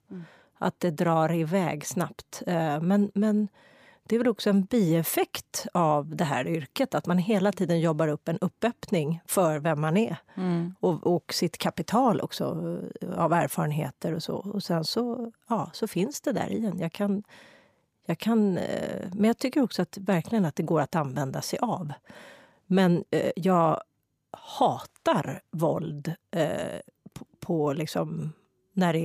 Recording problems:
abrupt cut into speech; at the end

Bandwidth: 15 kHz